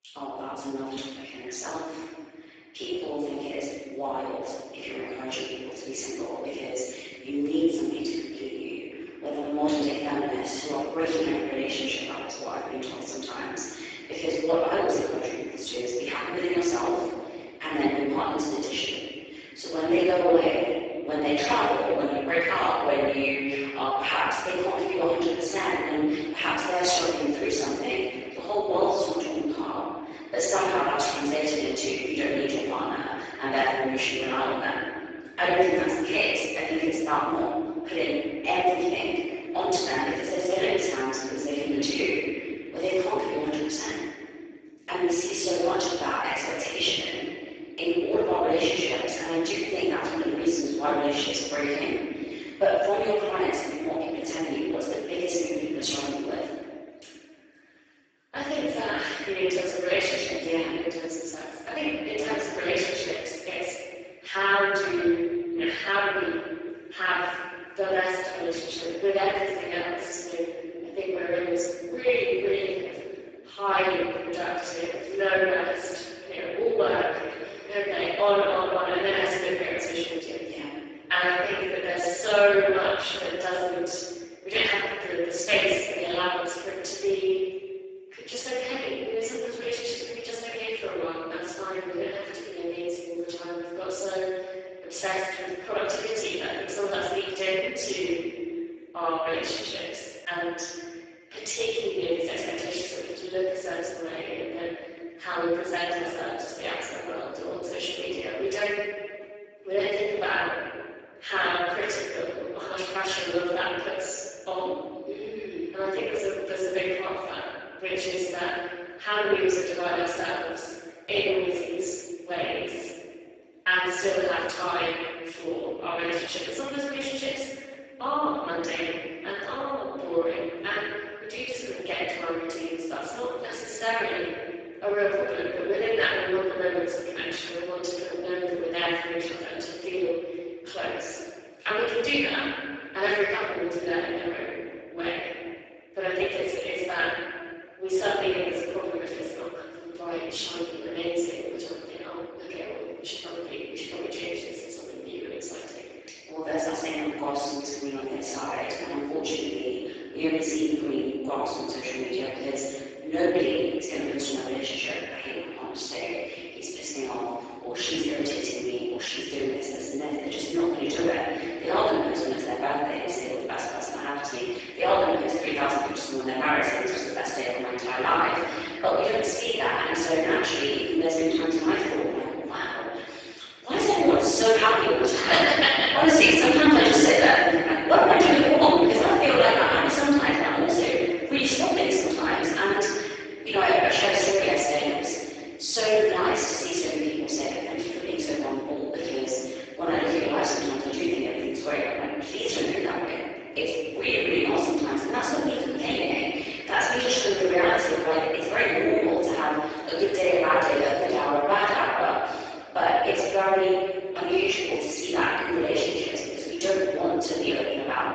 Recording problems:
room echo; strong; dies away in 1.7 s
off-mic speech; far
garbled, watery; badly; nothing above 7.5 kHz
thin; very slightly; fading below 300 Hz

